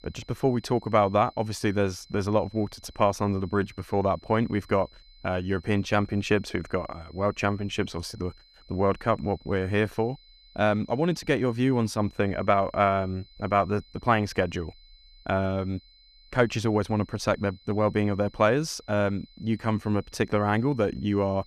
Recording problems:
high-pitched whine; faint; throughout; 4 kHz, 30 dB below the speech

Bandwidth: 14.5 kHz